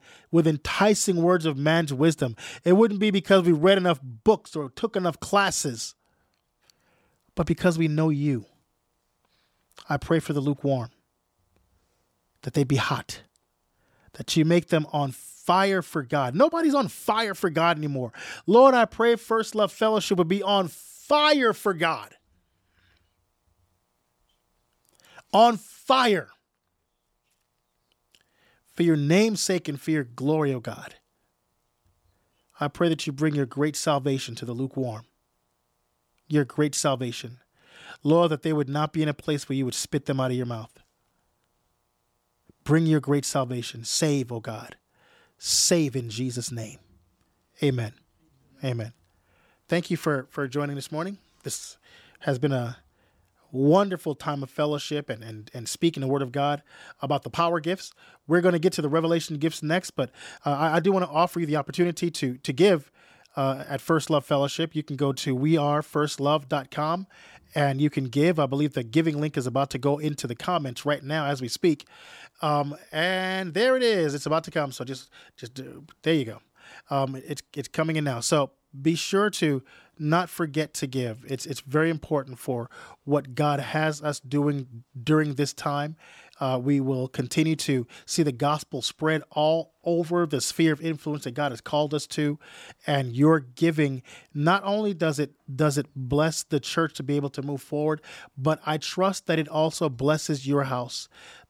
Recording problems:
none

